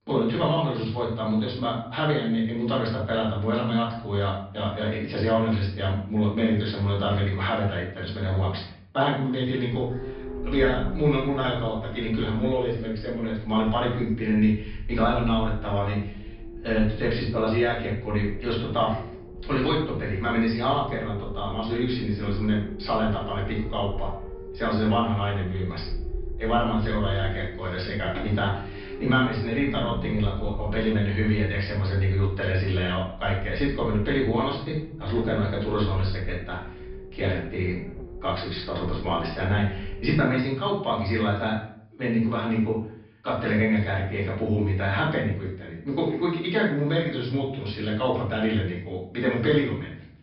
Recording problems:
off-mic speech; far
room echo; noticeable; dies away in 0.5 s
high frequencies cut off; noticeable; nothing above 5 kHz
low rumble; noticeable; from 9.5 to 40 s; 15 dB below the speech

